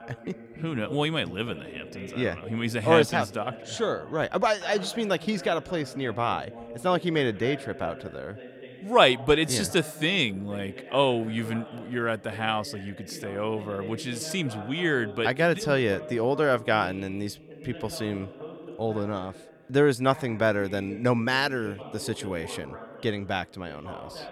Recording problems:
voice in the background; noticeable; throughout; 15 dB below the speech

